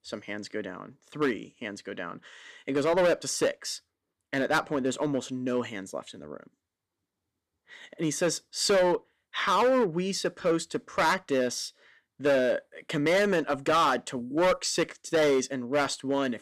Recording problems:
distortion; heavy; 7% of the sound clipped

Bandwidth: 14.5 kHz